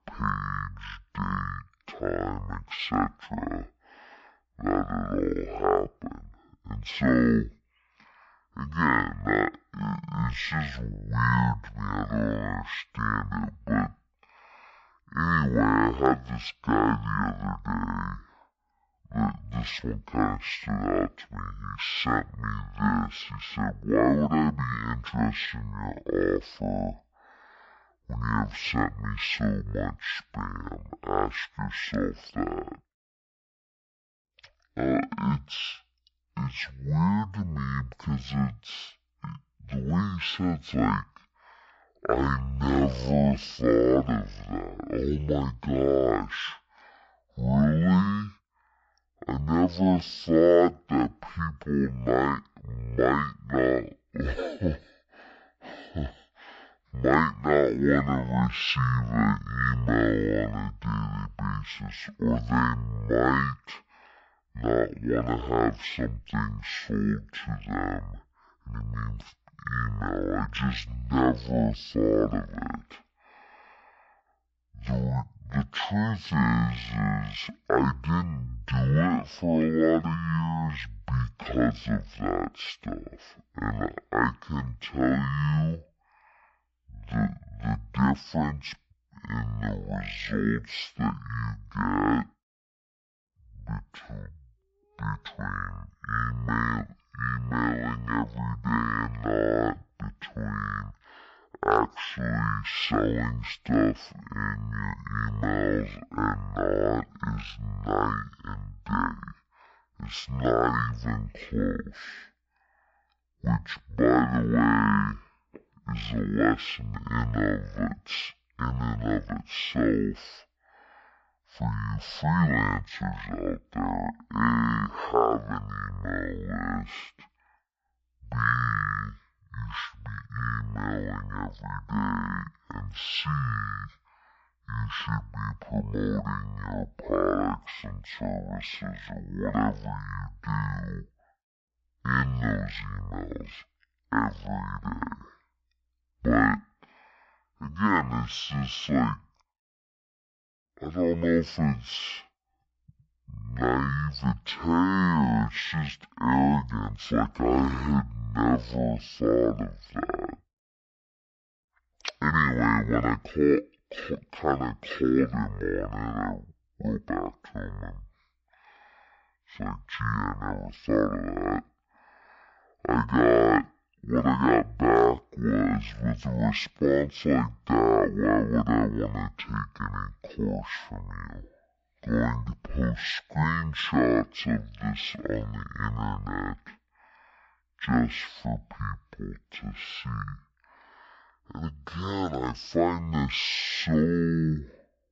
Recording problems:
wrong speed and pitch; too slow and too low; 0.5 times normal speed

